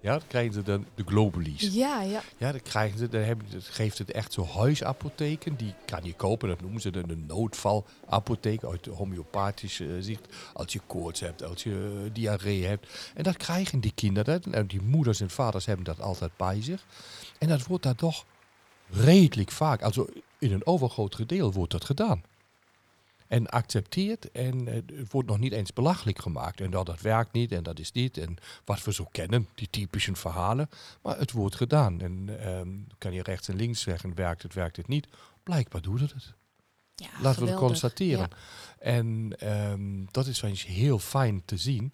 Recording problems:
crowd noise; faint; throughout; 30 dB below the speech

